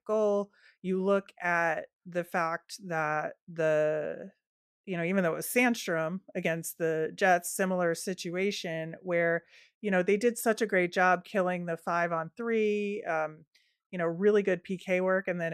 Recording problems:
abrupt cut into speech; at the end

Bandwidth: 14.5 kHz